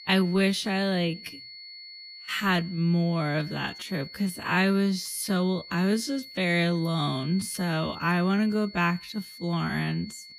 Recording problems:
wrong speed, natural pitch; too slow; 0.6 times normal speed
high-pitched whine; noticeable; throughout; 4.5 kHz, 15 dB below the speech

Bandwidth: 15 kHz